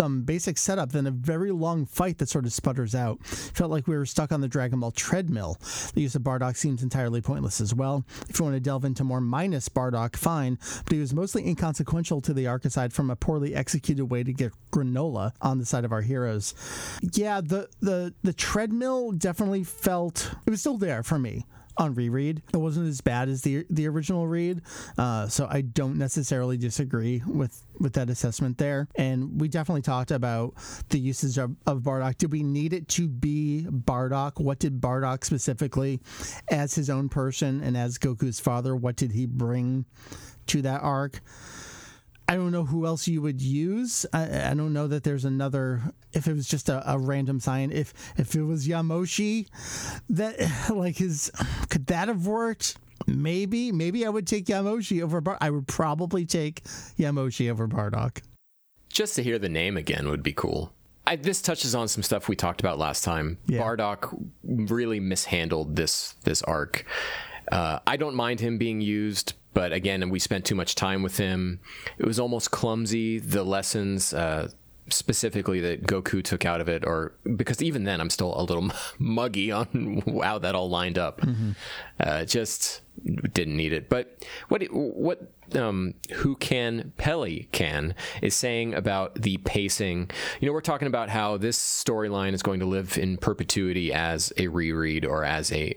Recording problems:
squashed, flat; somewhat
abrupt cut into speech; at the start

